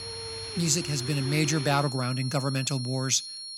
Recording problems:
high-pitched whine; loud; throughout; 4.5 kHz, 9 dB below the speech
rain or running water; noticeable; until 2 s; 10 dB below the speech

